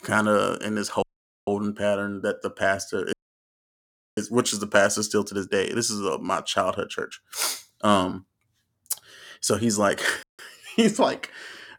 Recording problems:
audio cutting out; at 1 s, at 3 s for 1 s and at 10 s

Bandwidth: 17.5 kHz